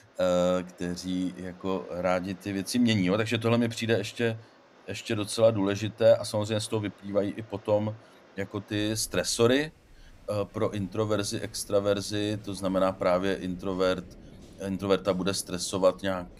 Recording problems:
rain or running water; faint; throughout; 25 dB below the speech

